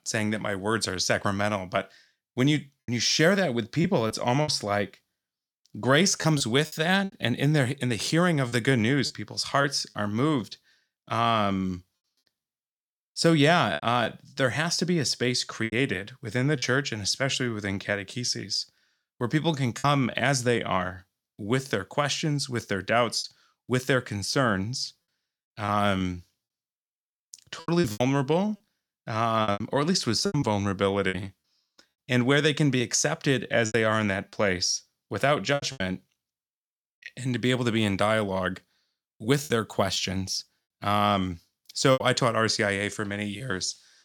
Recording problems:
choppy; very; 6% of the speech affected

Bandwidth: 17.5 kHz